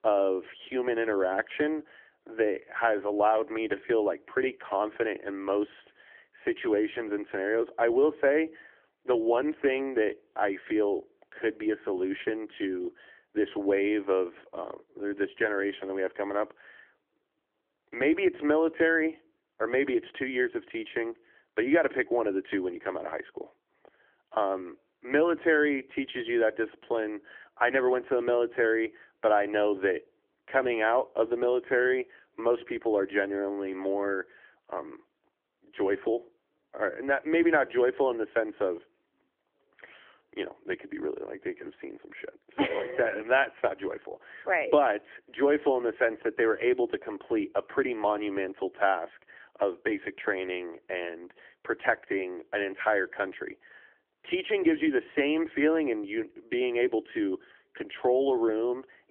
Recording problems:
phone-call audio; nothing above 3.5 kHz

